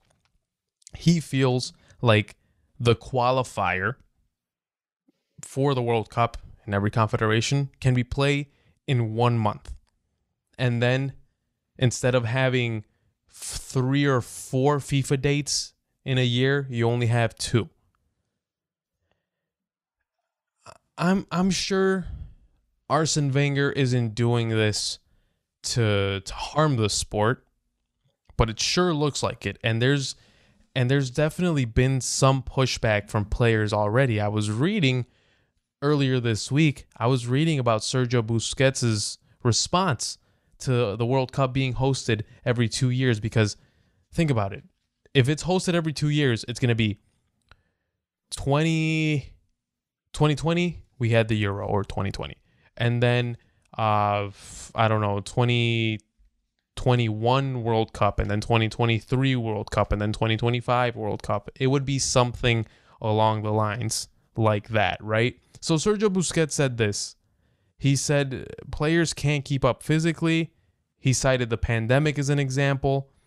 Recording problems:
none

